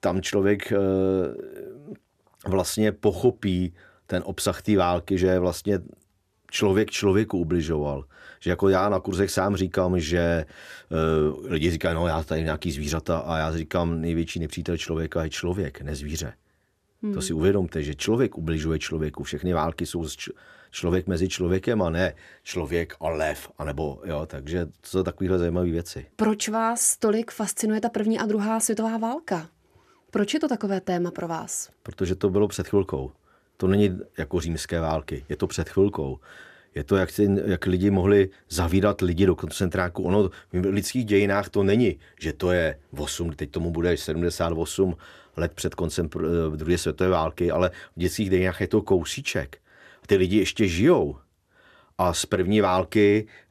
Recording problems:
none

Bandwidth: 14.5 kHz